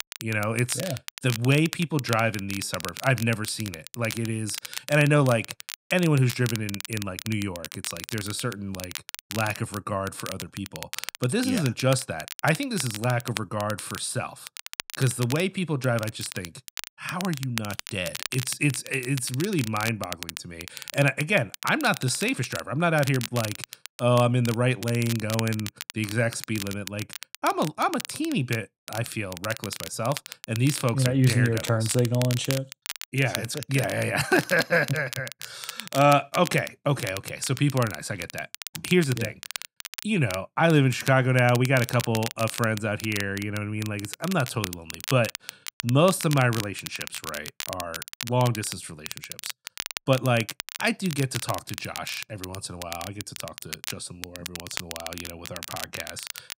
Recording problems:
crackle, like an old record; noticeable; 10 dB below the speech

